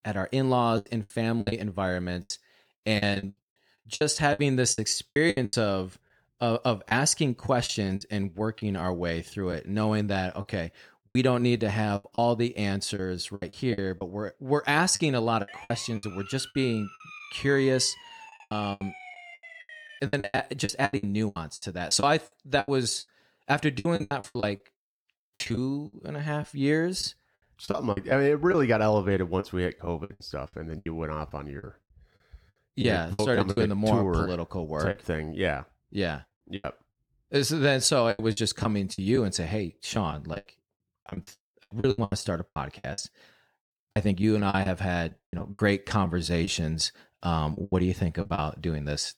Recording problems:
choppy; very; 14% of the speech affected
siren; faint; from 15 to 20 s; peak 15 dB below the speech

